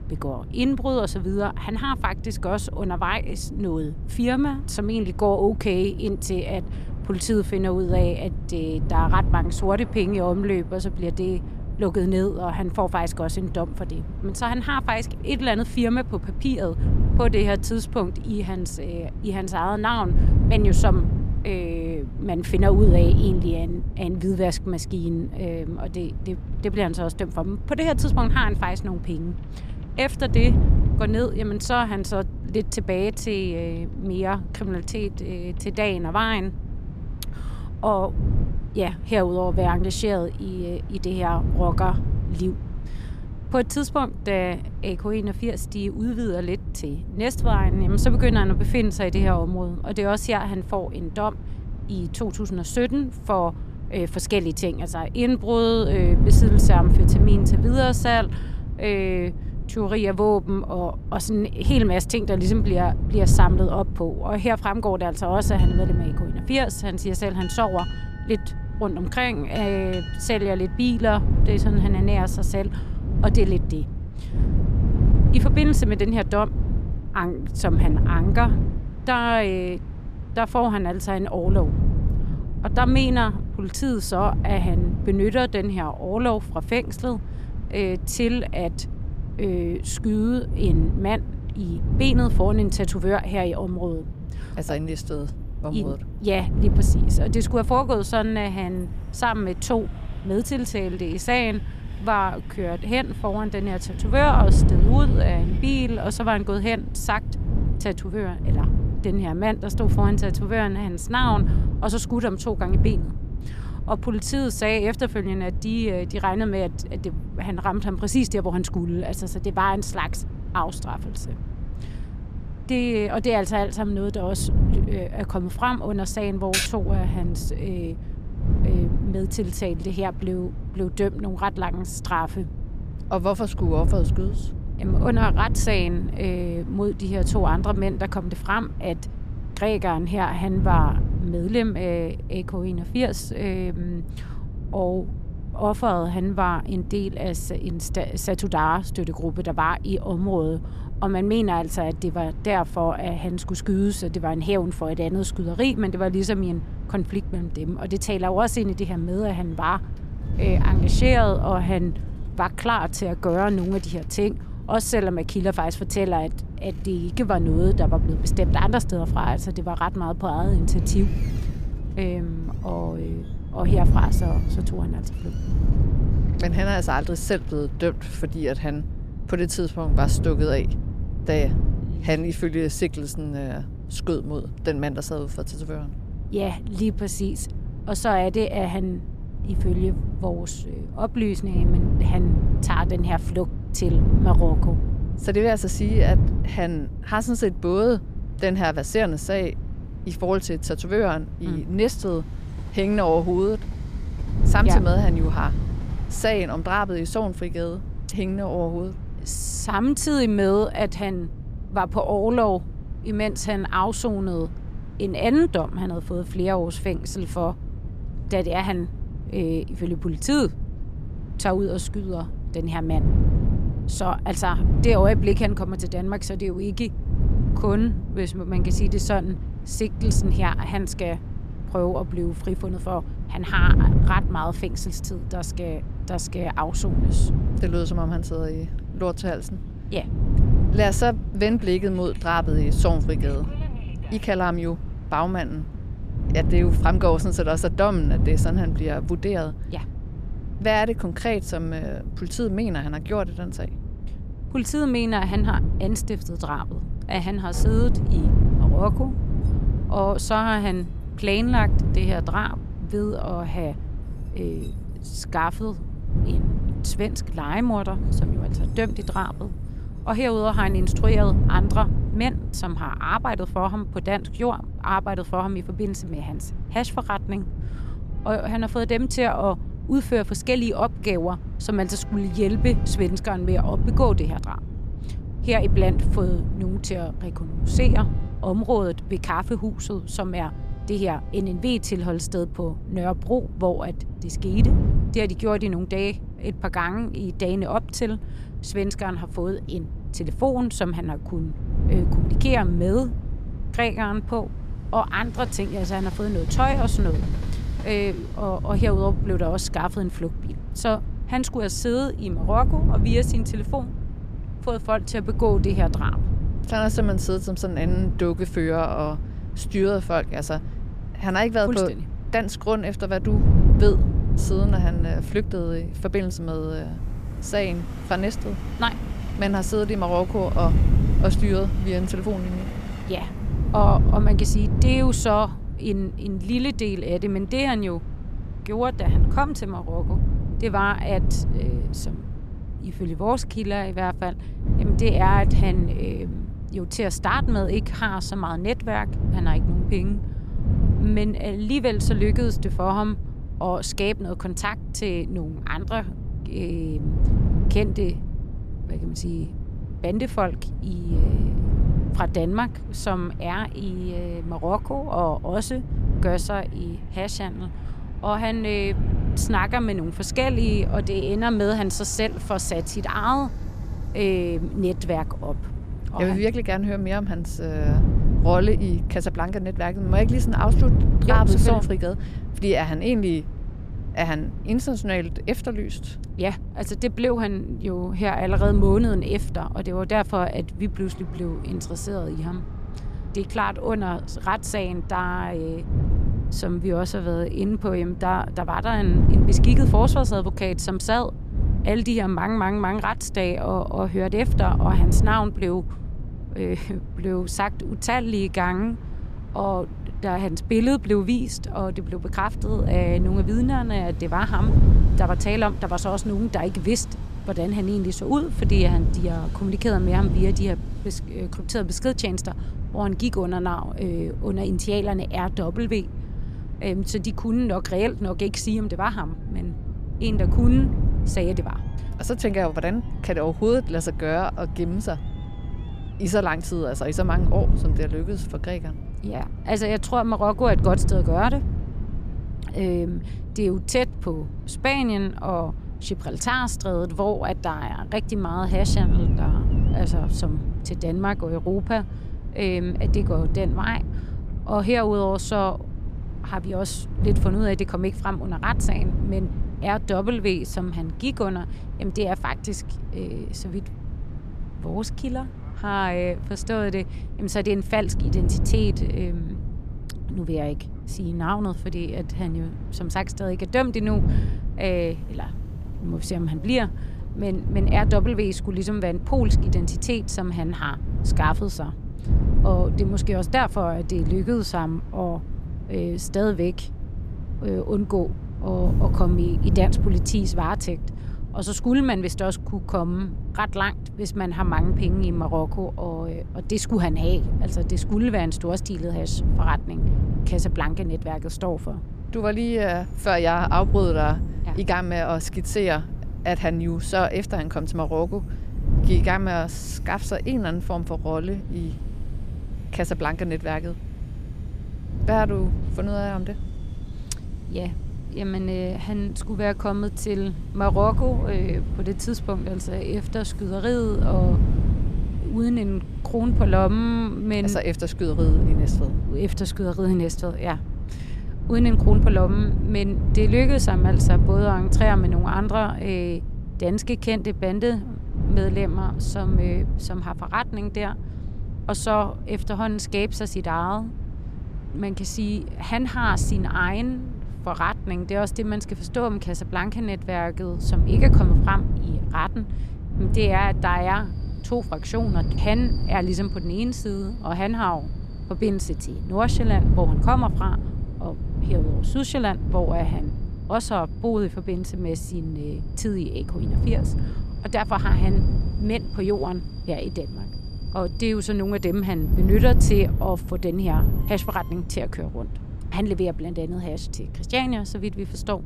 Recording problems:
wind noise on the microphone; occasional gusts; 15 dB below the speech
train or aircraft noise; faint; throughout; 25 dB below the speech
keyboard typing; loud; at 2:07; peak 2 dB above the speech

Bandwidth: 14.5 kHz